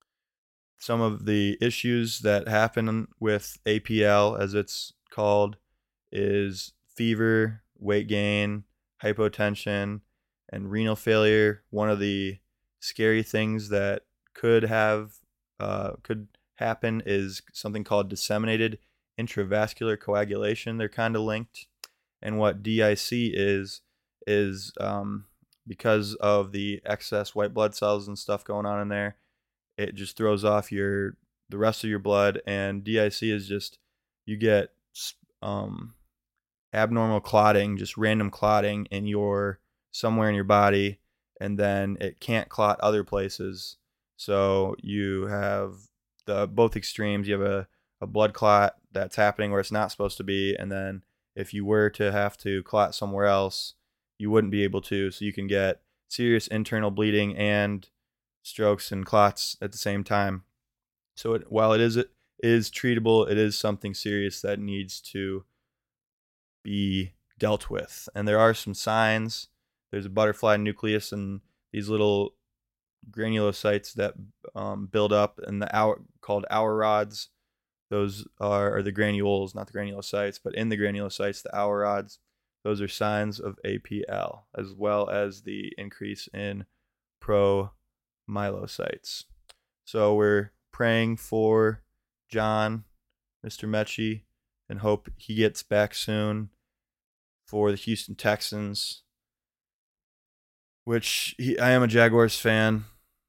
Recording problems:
none

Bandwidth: 16.5 kHz